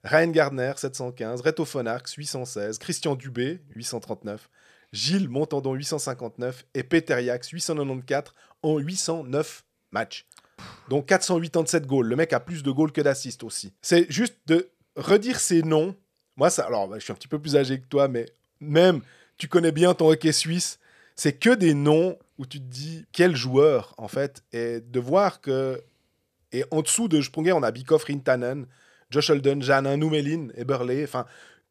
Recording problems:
none

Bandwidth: 14.5 kHz